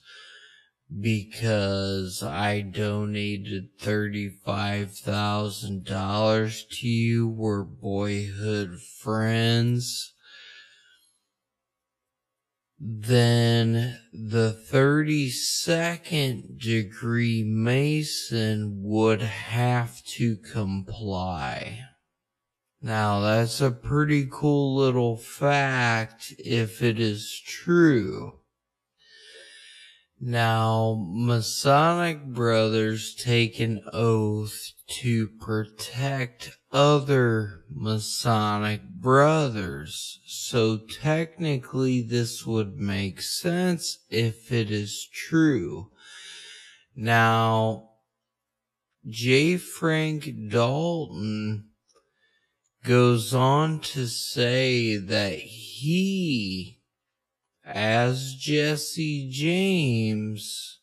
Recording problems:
wrong speed, natural pitch; too slow; 0.5 times normal speed

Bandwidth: 13.5 kHz